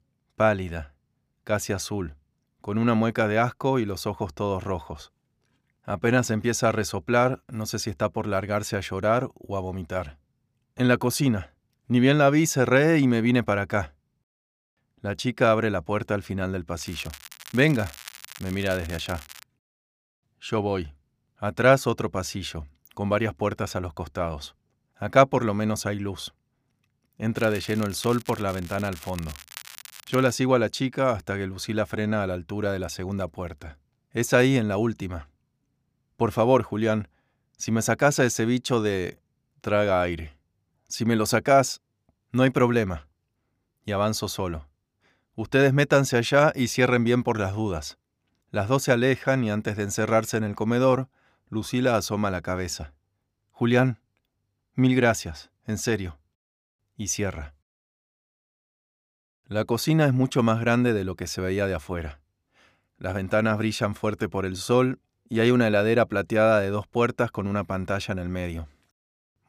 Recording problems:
crackling; noticeable; from 17 to 19 s and from 27 to 30 s; 20 dB below the speech

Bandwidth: 15 kHz